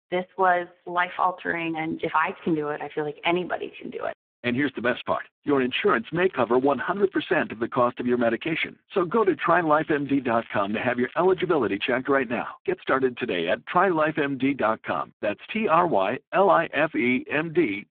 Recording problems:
phone-call audio; poor line
crackling; faint; from 6 to 7.5 s and from 9 to 12 s; 25 dB below the speech

